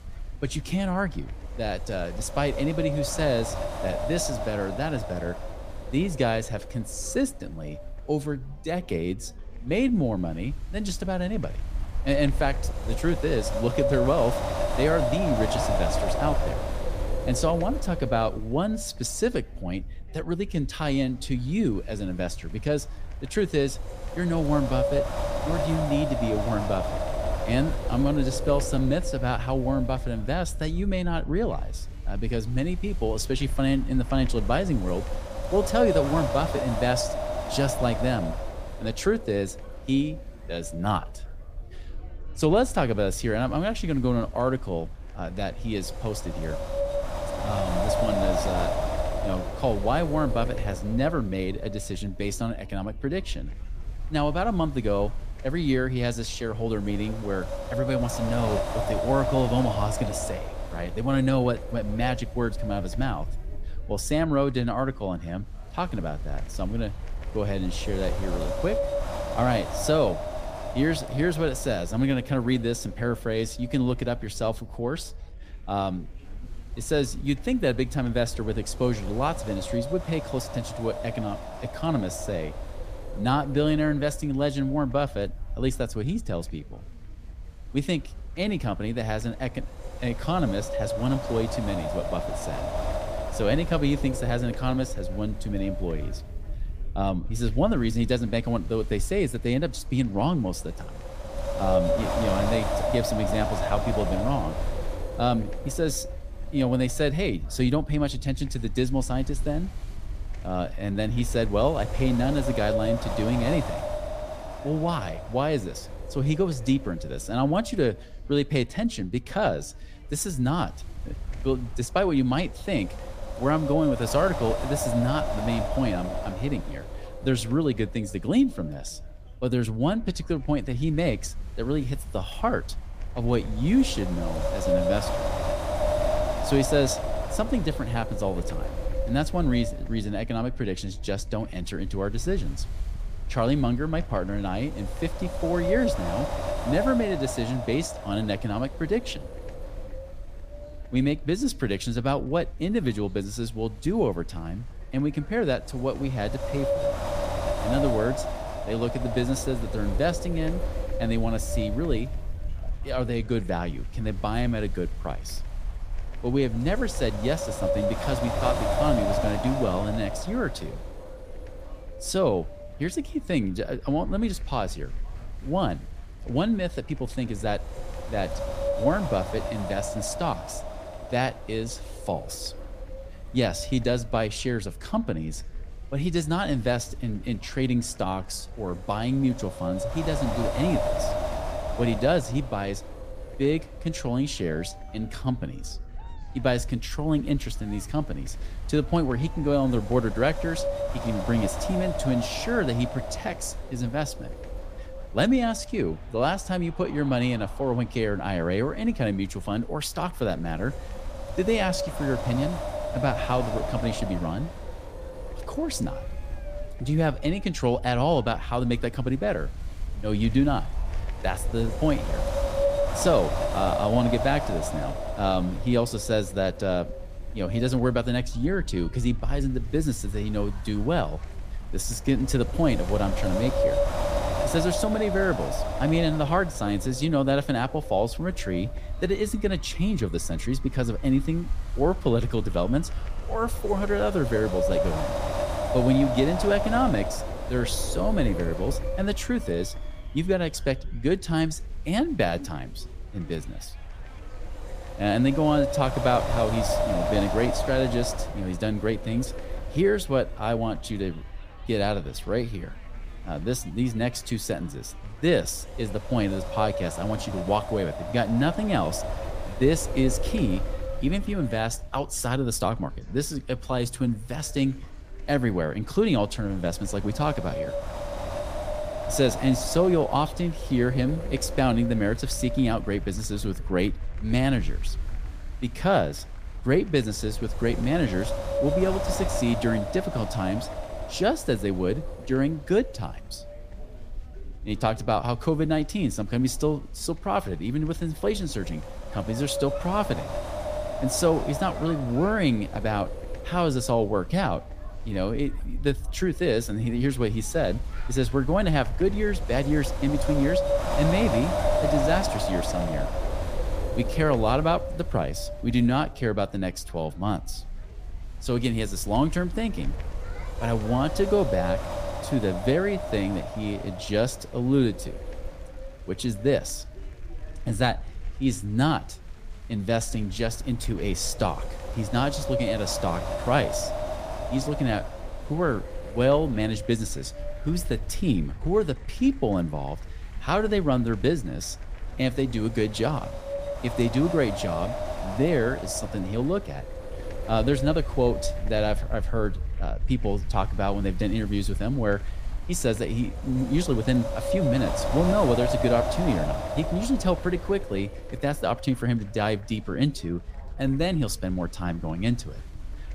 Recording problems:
wind noise on the microphone; heavy; 3 dB below the speech
chatter from many people; faint; throughout; 25 dB below the speech

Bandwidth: 15 kHz